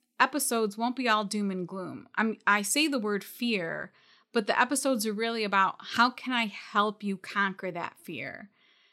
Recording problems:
none

